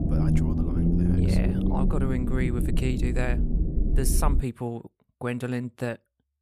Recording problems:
low rumble; loud; until 4.5 s; 1 dB below the speech

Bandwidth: 15 kHz